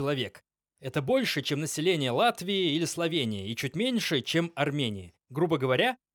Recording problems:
abrupt cut into speech; at the start

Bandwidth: 18 kHz